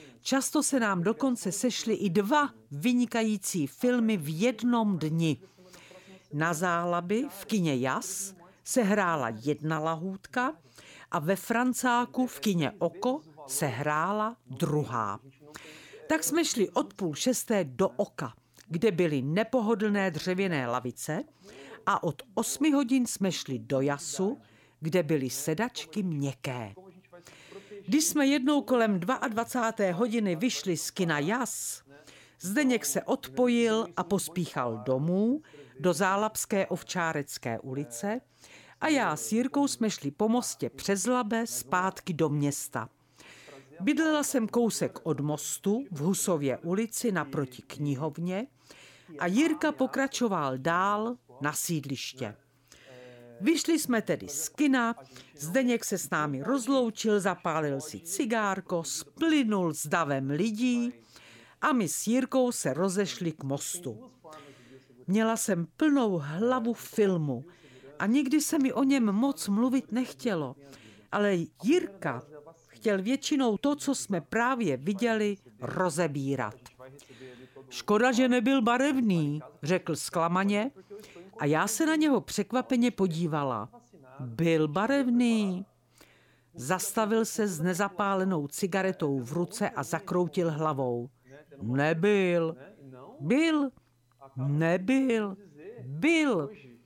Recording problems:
voice in the background; faint; throughout; 25 dB below the speech

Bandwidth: 17 kHz